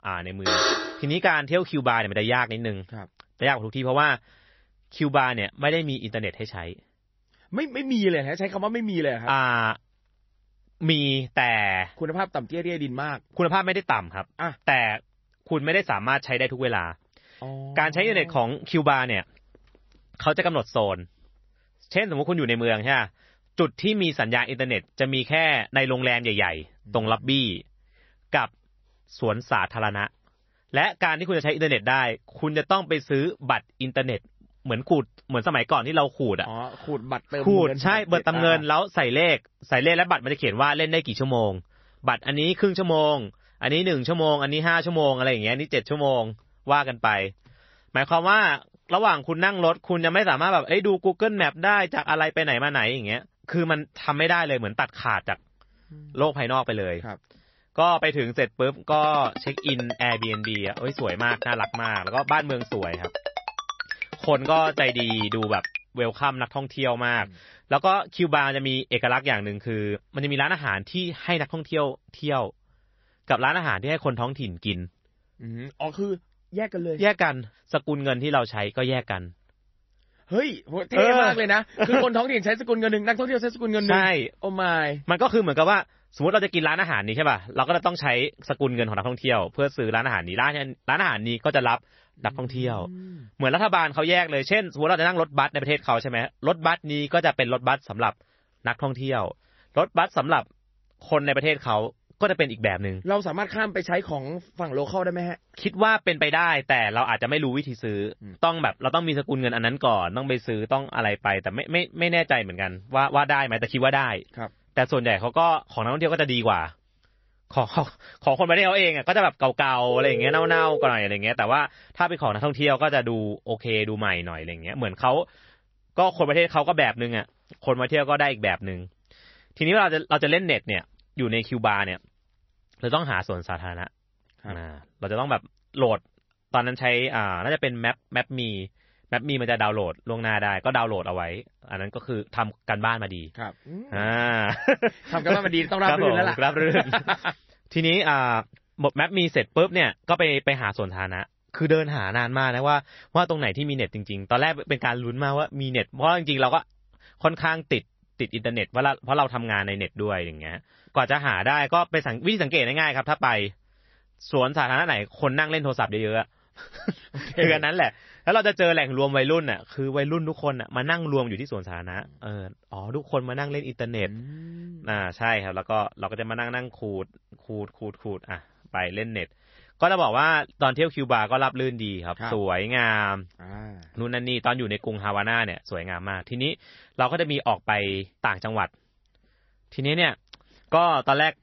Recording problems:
garbled, watery; slightly; nothing above 6 kHz
alarm; loud; at 0.5 s; peak 3 dB above the speech
phone ringing; noticeable; from 59 s to 1:06 and at 2:00; peak 2 dB below the speech

